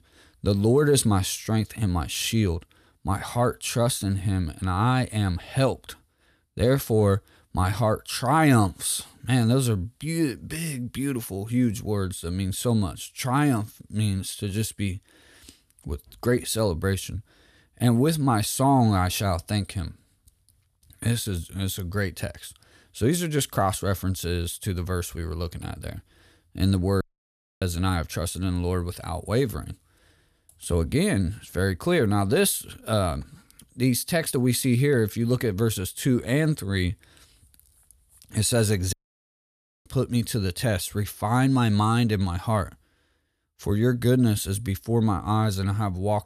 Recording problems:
audio cutting out; at 27 s for 0.5 s and at 39 s for 1 s

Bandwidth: 14.5 kHz